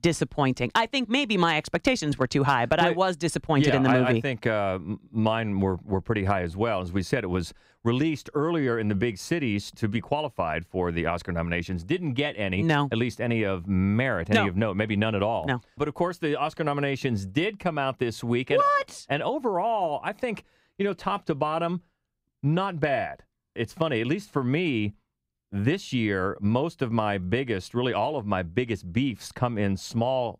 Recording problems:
none

